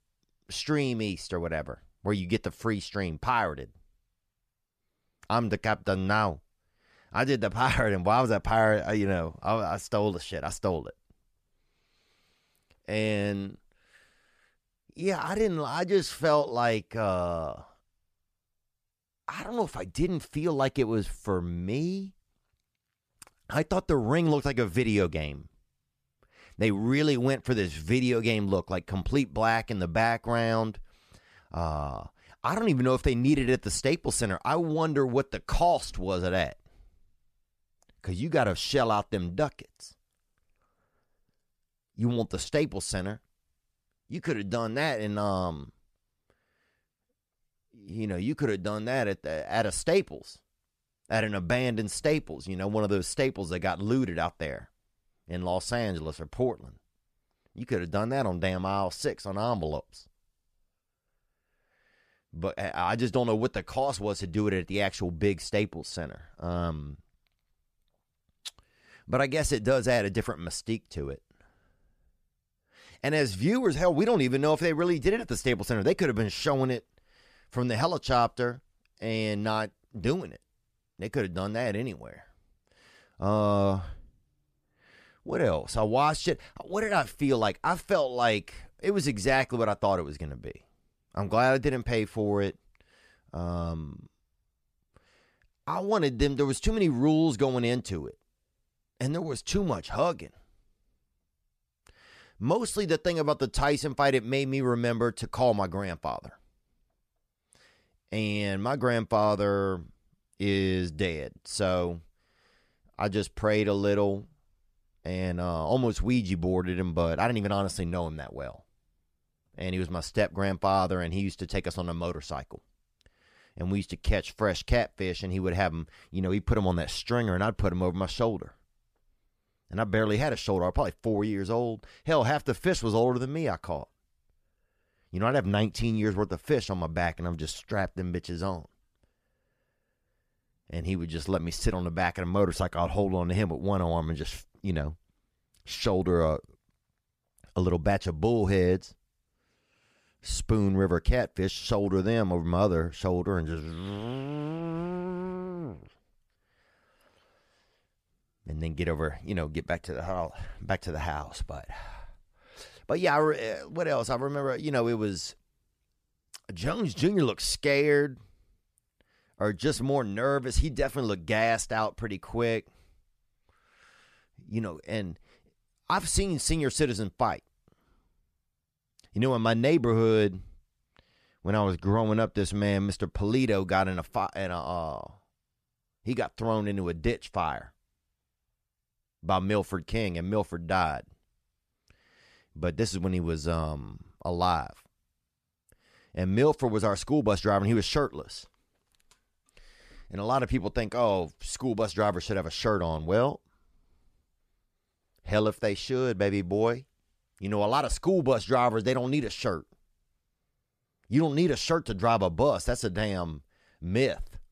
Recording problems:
none

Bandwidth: 14.5 kHz